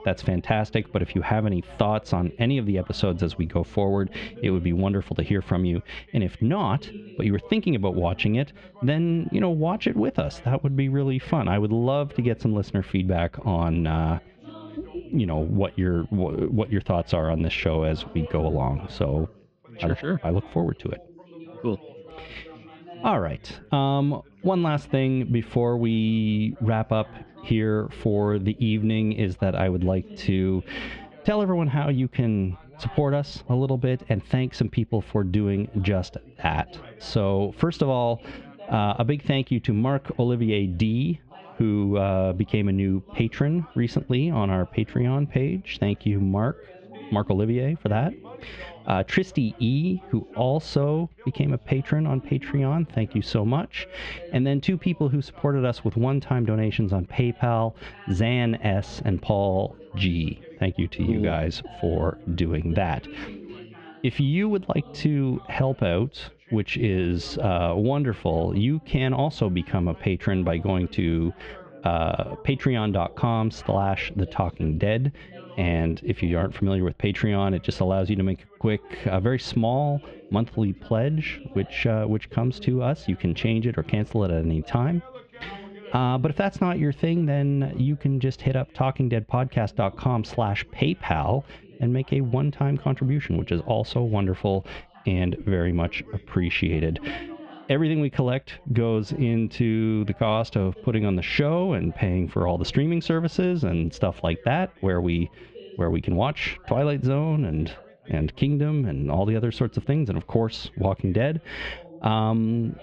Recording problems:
squashed, flat; heavily, background pumping
muffled; slightly; fading above 3.5 kHz
background chatter; faint; throughout; 3 voices, 25 dB below the speech

